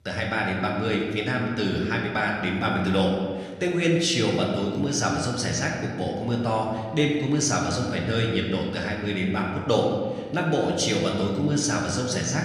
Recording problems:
room echo; noticeable; dies away in 1.5 s
off-mic speech; somewhat distant

